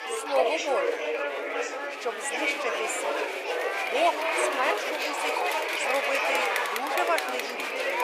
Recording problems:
thin; very; fading below 450 Hz
chatter from many people; very loud; throughout; 4 dB above the speech
dog barking; faint; from 1 to 2.5 s; peak 15 dB below the speech

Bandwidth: 15 kHz